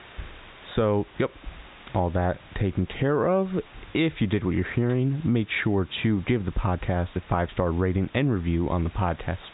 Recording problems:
high frequencies cut off; severe; nothing above 4 kHz
squashed, flat; somewhat
hiss; faint; throughout; 25 dB below the speech

